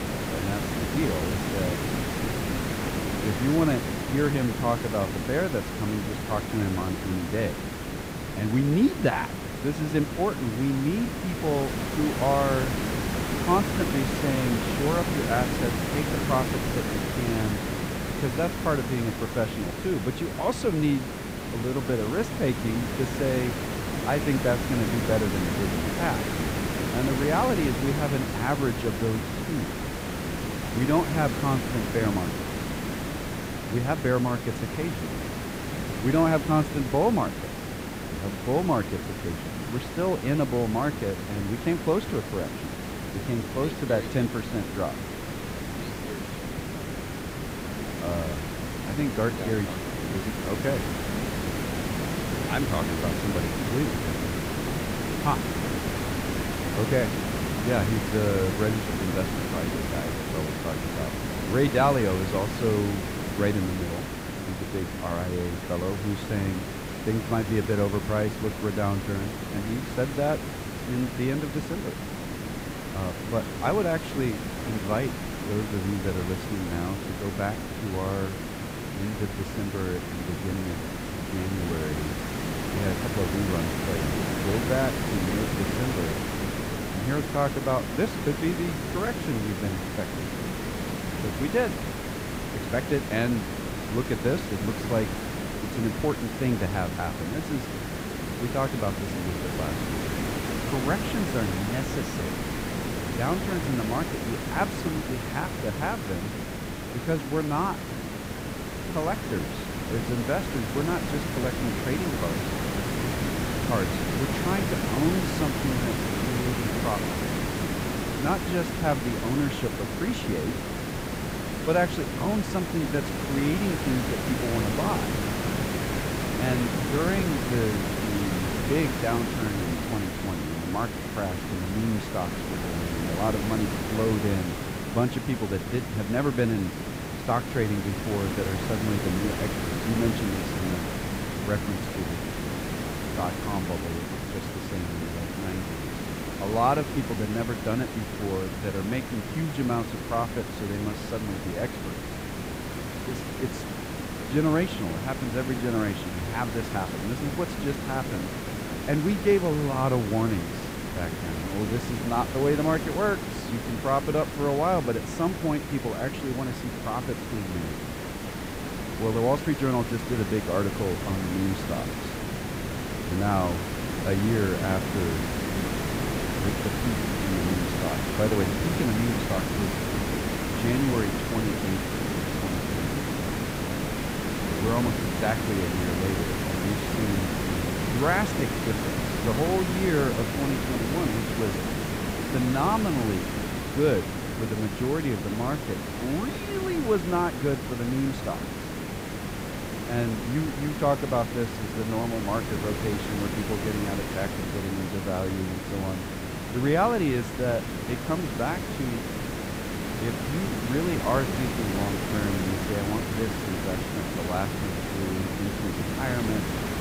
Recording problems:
hiss; loud; throughout; 2 dB below the speech

